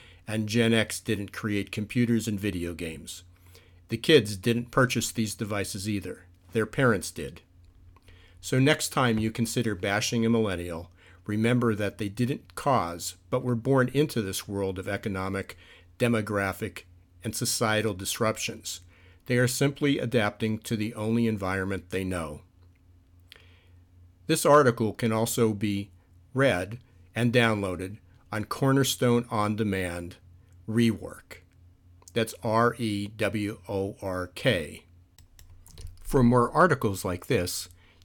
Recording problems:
none

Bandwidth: 17.5 kHz